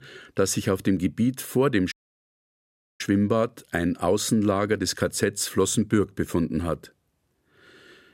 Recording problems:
audio cutting out; at 2 s for 1 s

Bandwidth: 16 kHz